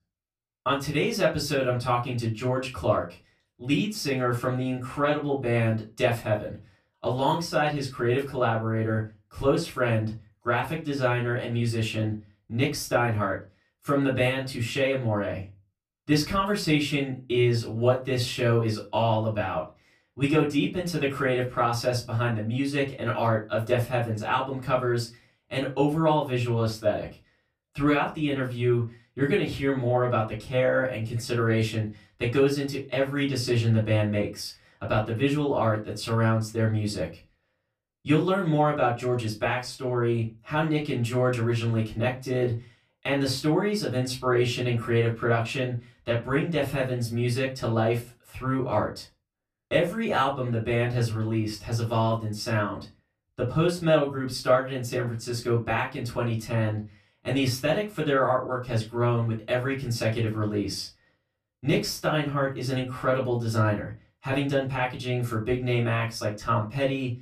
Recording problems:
off-mic speech; far
room echo; very slight; dies away in 0.2 s

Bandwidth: 14.5 kHz